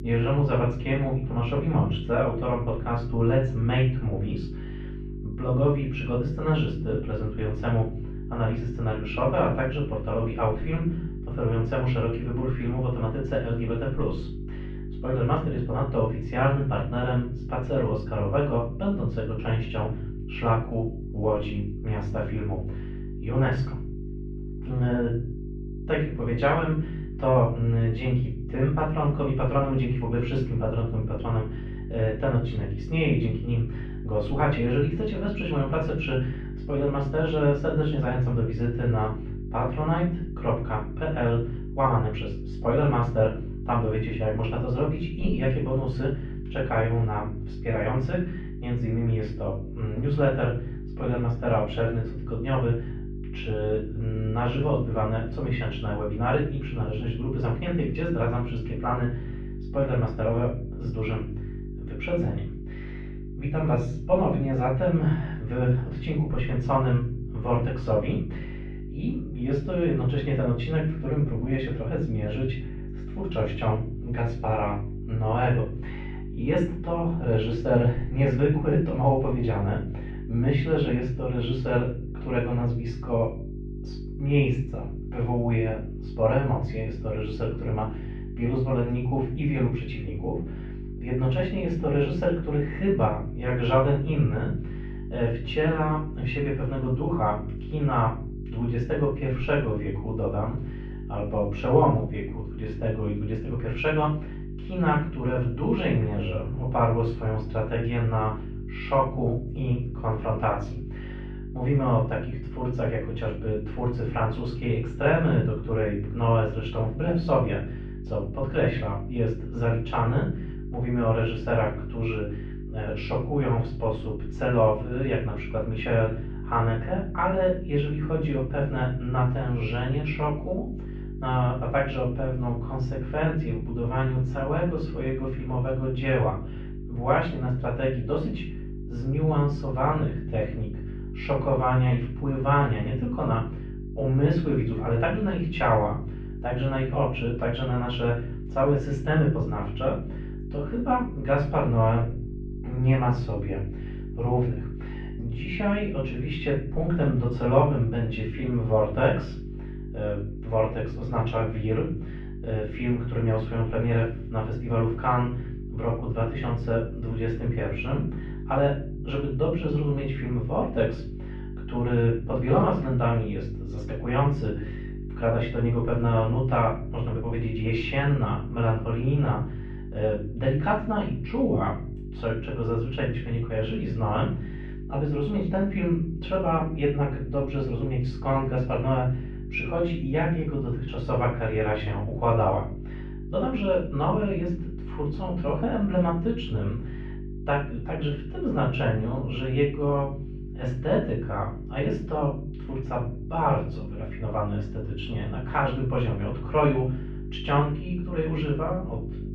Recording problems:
off-mic speech; far
muffled; very; fading above 3 kHz
room echo; noticeable; dies away in 0.5 s
electrical hum; noticeable; throughout; 50 Hz, 15 dB below the speech

